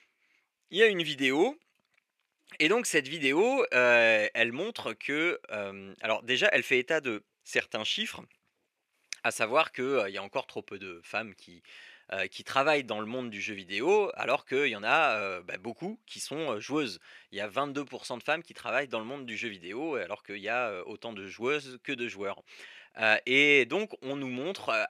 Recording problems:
thin; somewhat; fading below 350 Hz

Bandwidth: 14 kHz